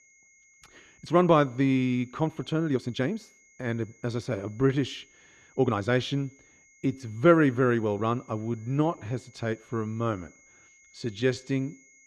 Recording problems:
muffled; slightly; fading above 3 kHz
high-pitched whine; faint; throughout; 2 kHz, 30 dB below the speech
uneven, jittery; strongly; from 1 to 11 s

